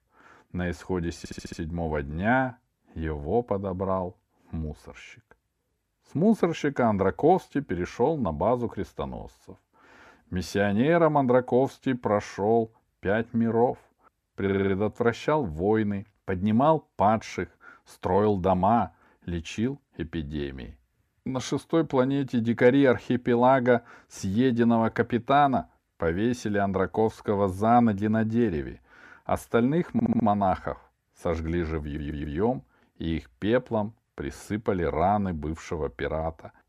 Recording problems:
audio stuttering; 4 times, first at 1 s

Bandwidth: 14.5 kHz